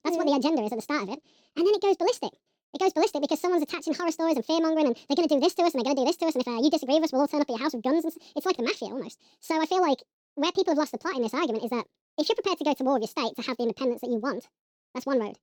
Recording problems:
wrong speed and pitch; too fast and too high; 1.7 times normal speed

